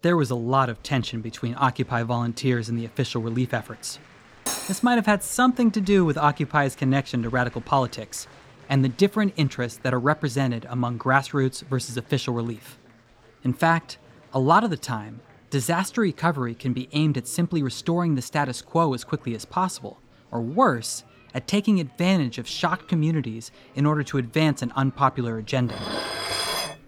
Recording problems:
murmuring crowd; faint; throughout; 25 dB below the speech
clattering dishes; noticeable; at 4.5 s and from 26 s on; peak 1 dB below the speech

